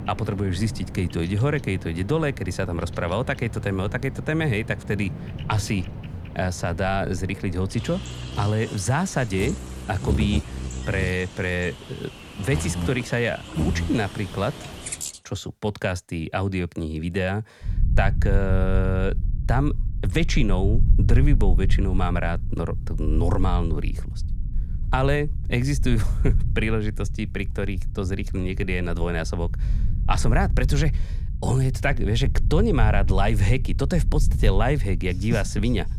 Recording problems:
animal sounds; loud; until 15 s; 7 dB below the speech
low rumble; noticeable; from 18 s on; 15 dB below the speech

